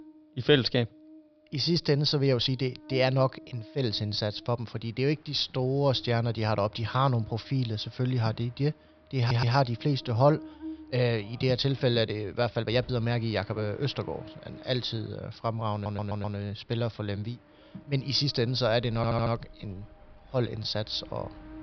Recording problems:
high frequencies cut off; noticeable; nothing above 5.5 kHz
electrical hum; faint; throughout; 60 Hz, 25 dB below the speech
train or aircraft noise; faint; from 5 s on; 30 dB below the speech
uneven, jittery; strongly; from 1.5 to 21 s
audio stuttering; at 9 s, at 16 s and at 19 s

